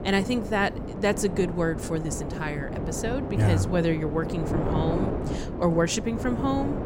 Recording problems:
wind noise on the microphone; heavy; 6 dB below the speech

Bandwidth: 16 kHz